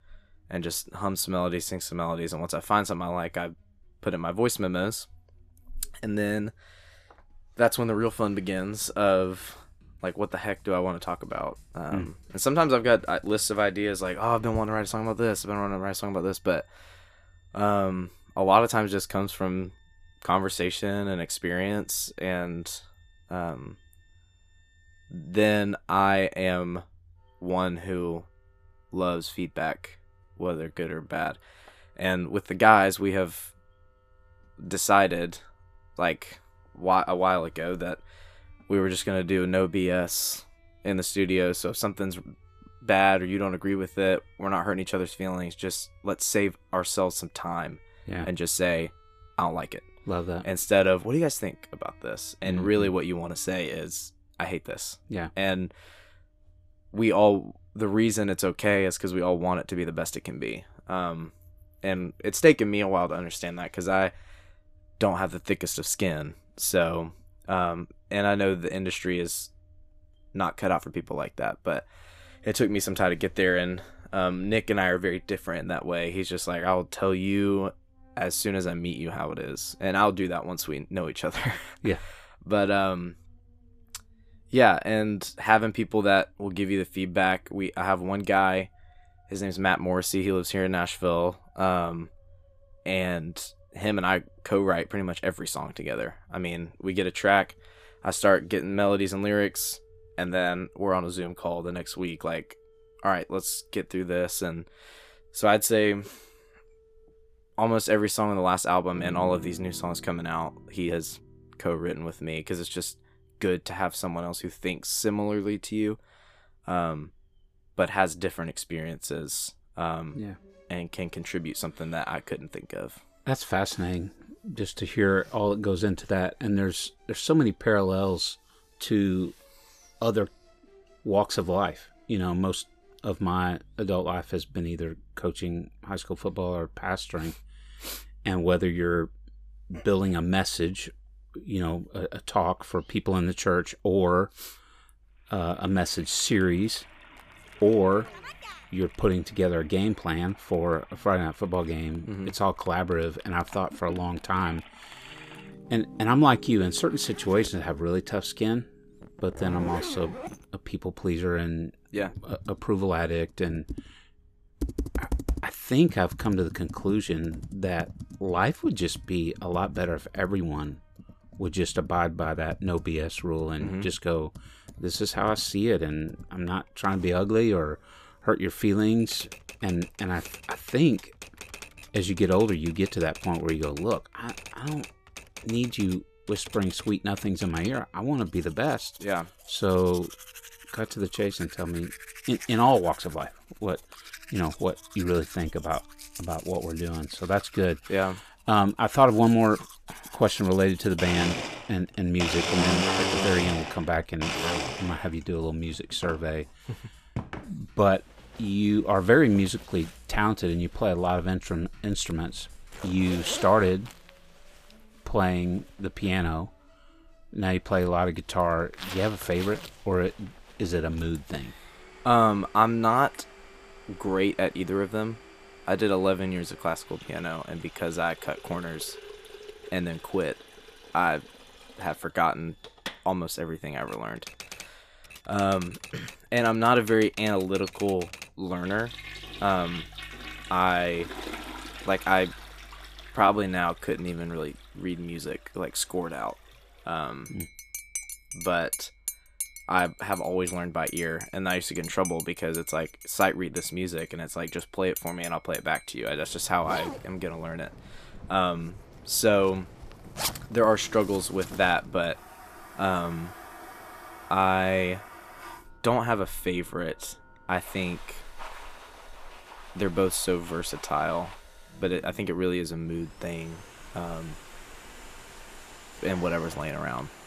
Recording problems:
household noises; noticeable; from 2:26 on; 10 dB below the speech
background music; faint; throughout; 30 dB below the speech
uneven, jittery; strongly; from 30 s to 4:04

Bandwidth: 14.5 kHz